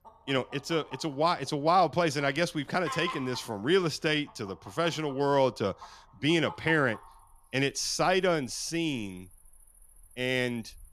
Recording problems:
animal sounds; noticeable; throughout; 20 dB below the speech

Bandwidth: 14.5 kHz